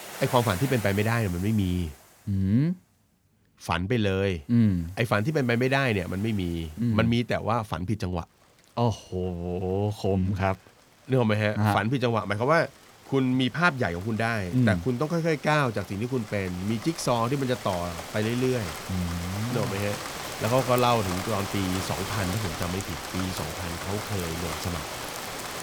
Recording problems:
rain or running water; loud; throughout; 9 dB below the speech

